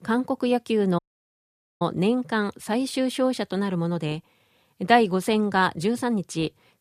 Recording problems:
audio cutting out; at 1 s for 1 s

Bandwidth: 14.5 kHz